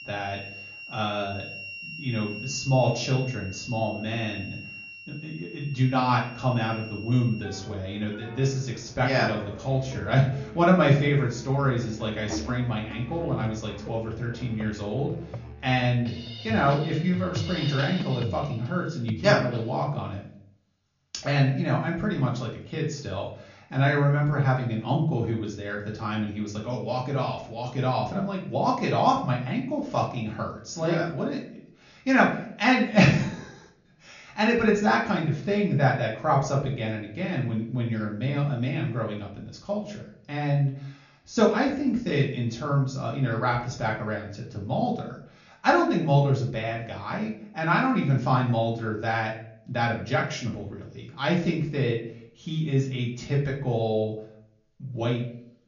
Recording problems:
off-mic speech; far
high frequencies cut off; noticeable; nothing above 7 kHz
room echo; slight; dies away in 0.5 s
background music; noticeable; until 19 s; 10 dB below the speech

